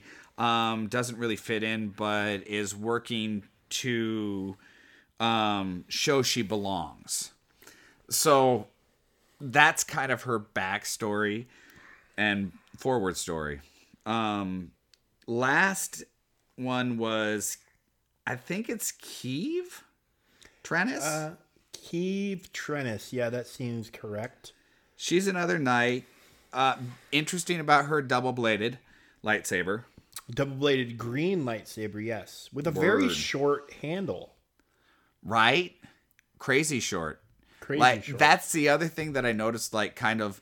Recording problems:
none

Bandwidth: 18 kHz